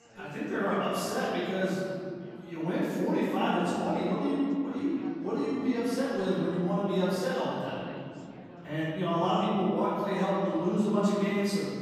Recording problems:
room echo; strong; dies away in 2.2 s
off-mic speech; far
chatter from many people; faint; throughout; 20 dB below the speech

